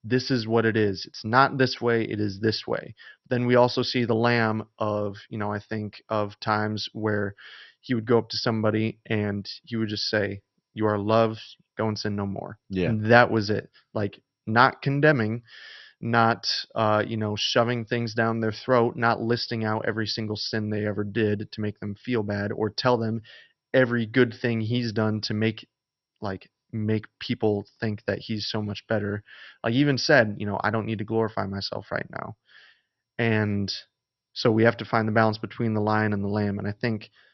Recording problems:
garbled, watery; slightly; nothing above 5.5 kHz

